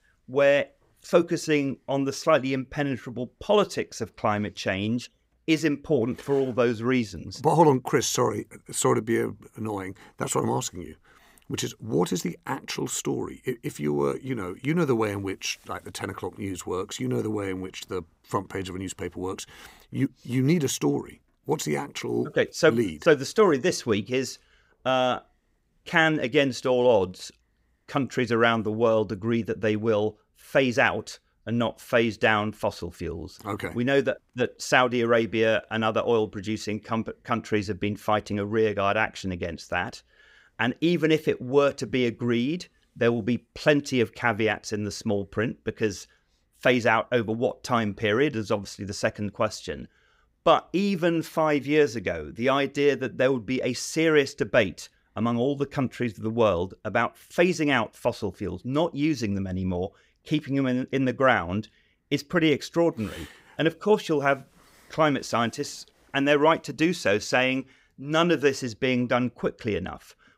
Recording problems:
none

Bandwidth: 15.5 kHz